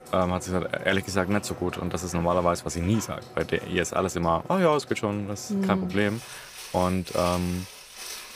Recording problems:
household noises; noticeable; throughout; 15 dB below the speech

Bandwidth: 15 kHz